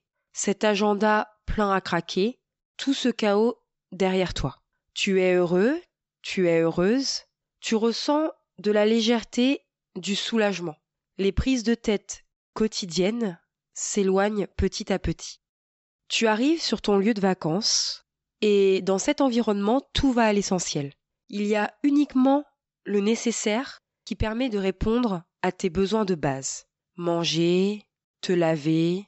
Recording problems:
high frequencies cut off; noticeable; nothing above 8 kHz

